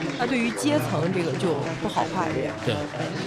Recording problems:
chatter from many people; loud; throughout; 3 dB below the speech

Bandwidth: 15.5 kHz